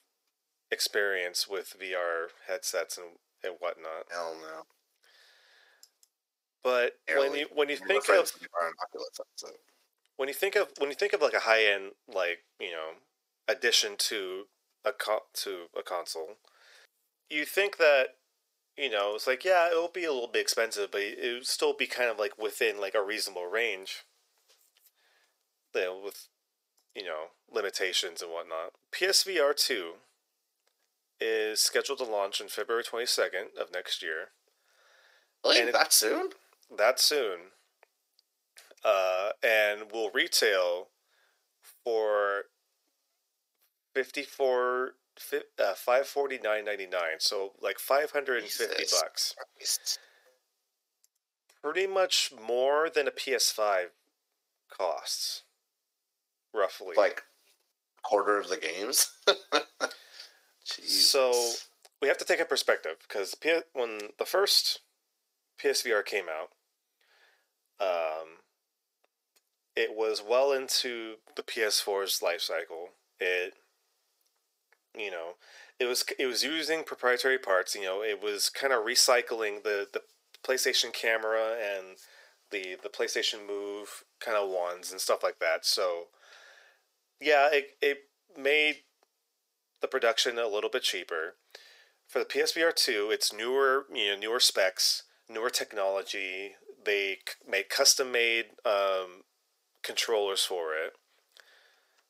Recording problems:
thin; very; fading below 450 Hz

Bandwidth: 15.5 kHz